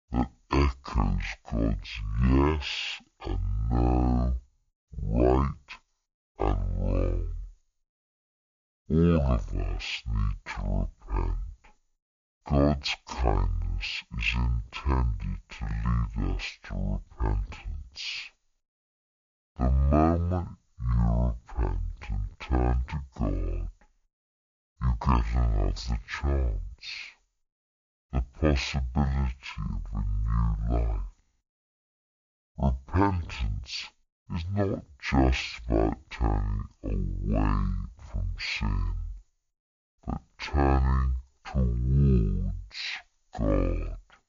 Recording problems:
wrong speed and pitch; too slow and too low; 0.5 times normal speed

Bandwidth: 7 kHz